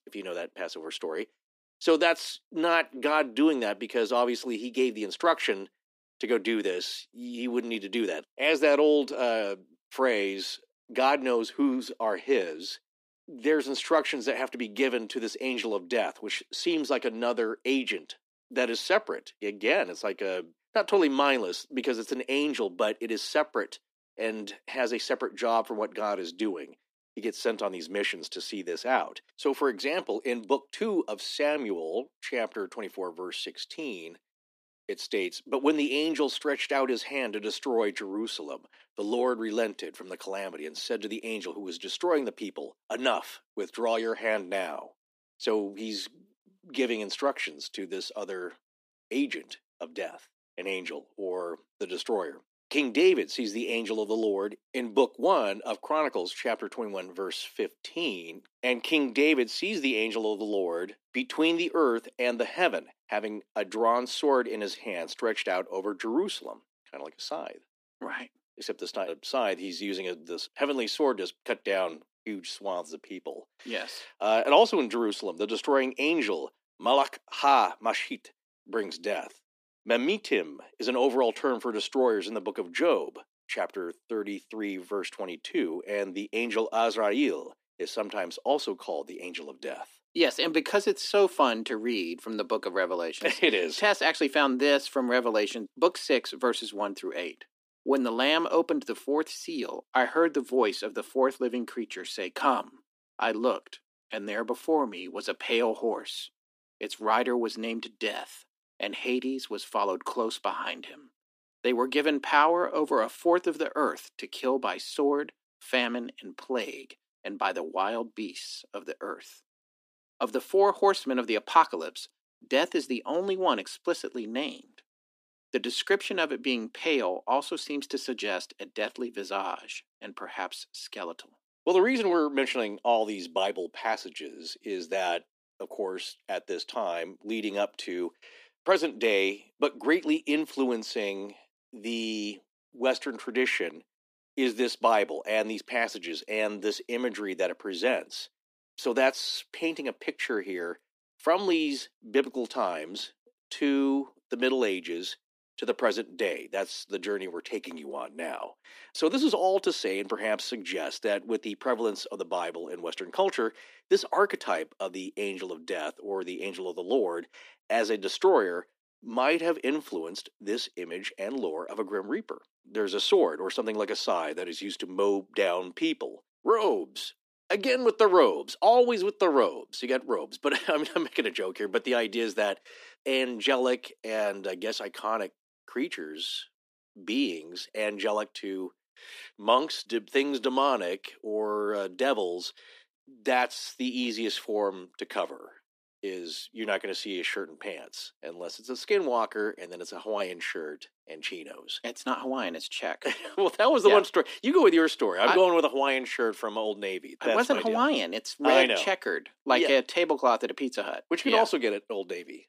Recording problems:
thin; somewhat; fading below 300 Hz

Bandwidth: 15 kHz